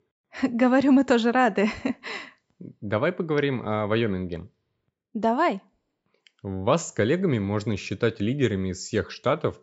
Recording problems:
high frequencies cut off; noticeable; nothing above 8 kHz

